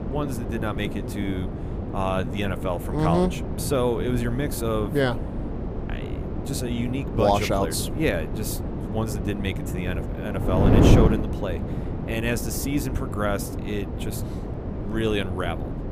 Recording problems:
wind noise on the microphone; heavy; 5 dB below the speech

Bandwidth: 15 kHz